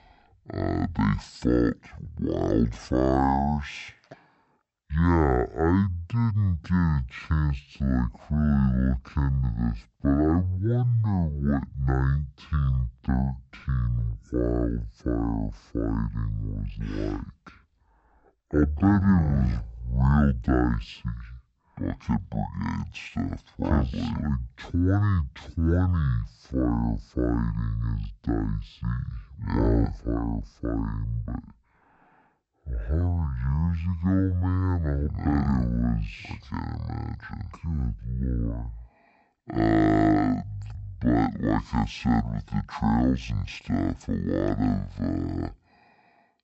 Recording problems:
wrong speed and pitch; too slow and too low; 0.5 times normal speed

